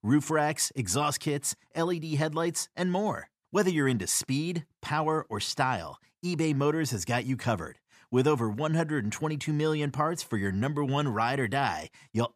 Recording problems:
none

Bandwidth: 14.5 kHz